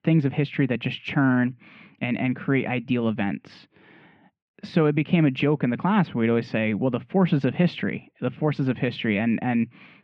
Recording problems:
muffled; very; fading above 2.5 kHz

